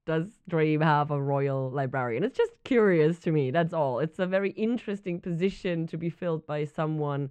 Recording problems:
muffled; slightly; fading above 2.5 kHz

